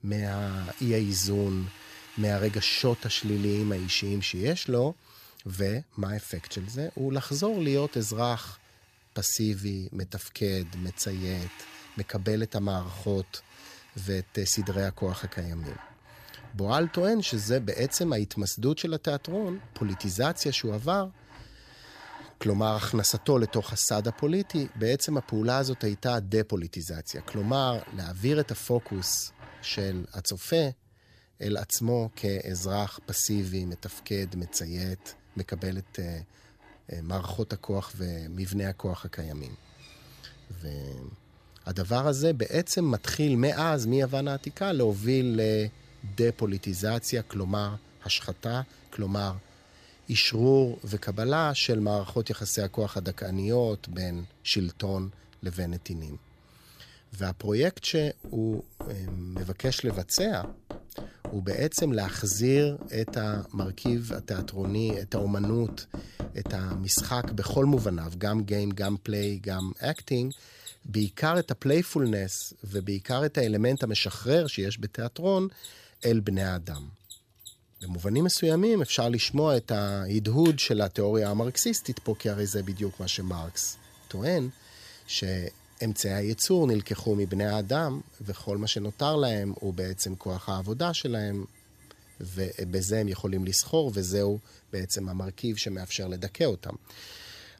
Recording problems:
machinery noise; noticeable; throughout; 20 dB below the speech

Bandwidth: 14.5 kHz